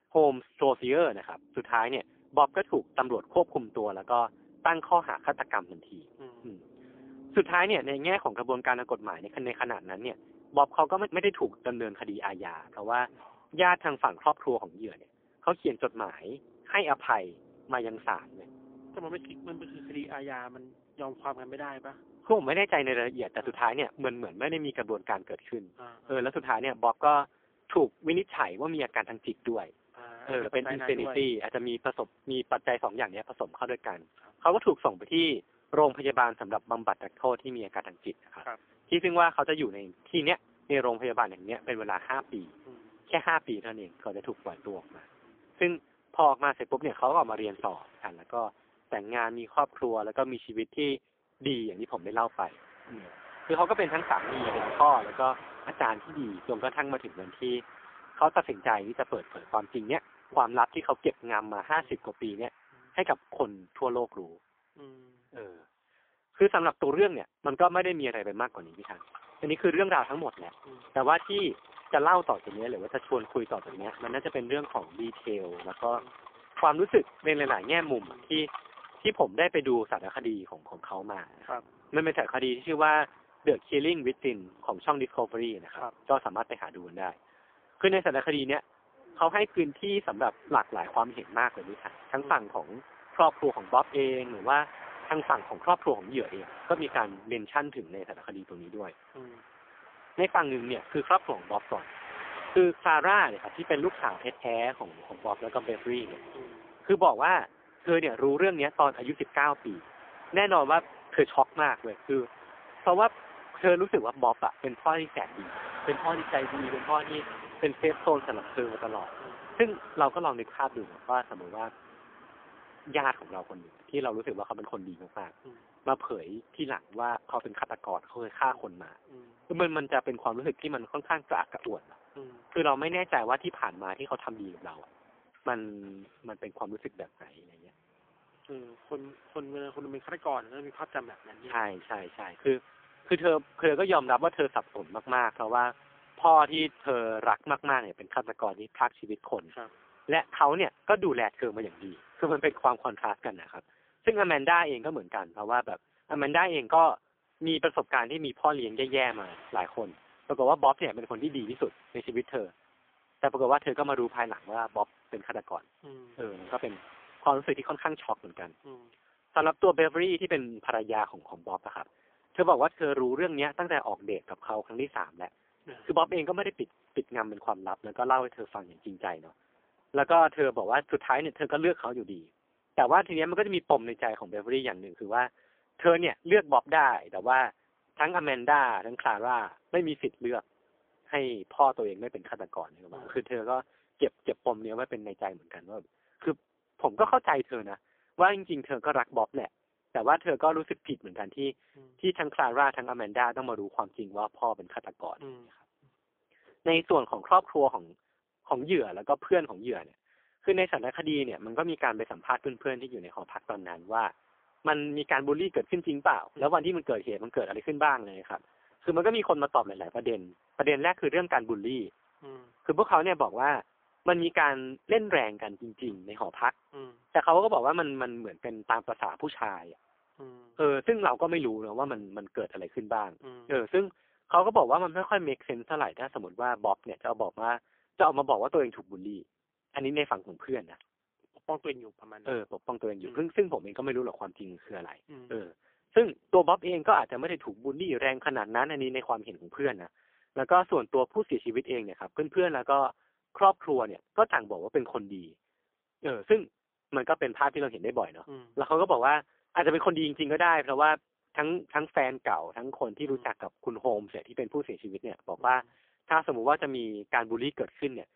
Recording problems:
phone-call audio; poor line; nothing above 3.5 kHz
traffic noise; noticeable; throughout; 20 dB below the speech

